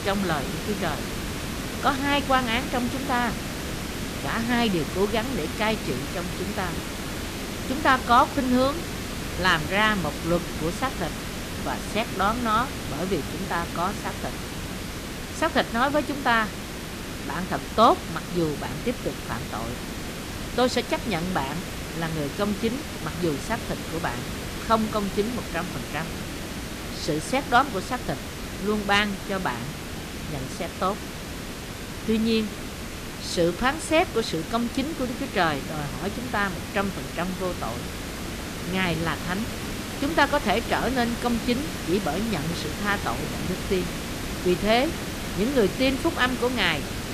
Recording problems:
hiss; loud; throughout; 6 dB below the speech

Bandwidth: 14.5 kHz